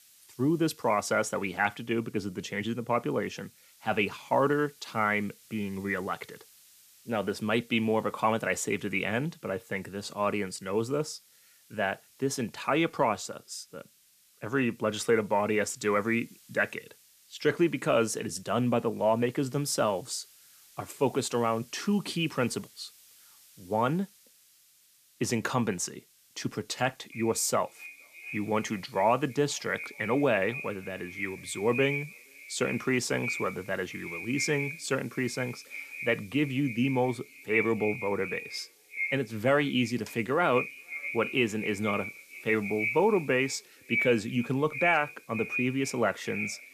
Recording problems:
echo of what is said; strong; from 27 s on; 470 ms later, 7 dB below the speech
hiss; faint; throughout; 25 dB below the speech

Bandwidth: 14.5 kHz